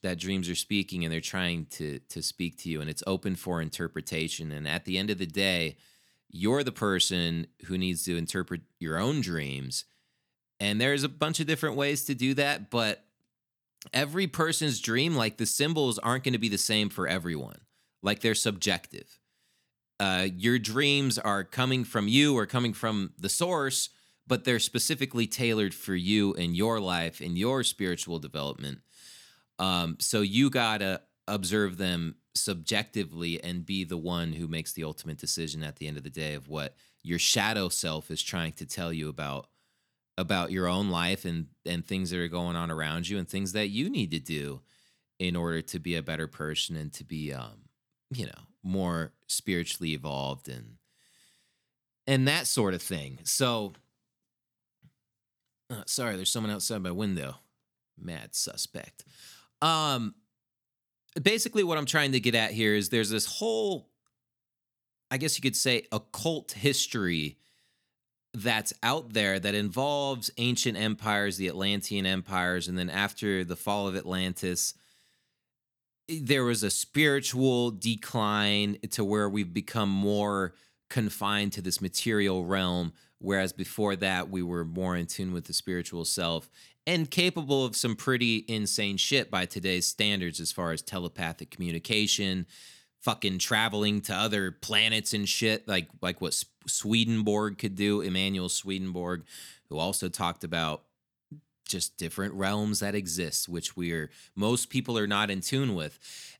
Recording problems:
none

